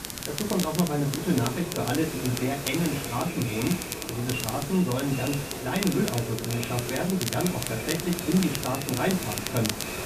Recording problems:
echo of what is said; strong; throughout; 390 ms later, 10 dB below the speech
off-mic speech; far
high frequencies cut off; severe; nothing above 4 kHz
room echo; very slight; dies away in 0.2 s
hiss; loud; throughout; 7 dB below the speech
crackle, like an old record; loud; 7 dB below the speech

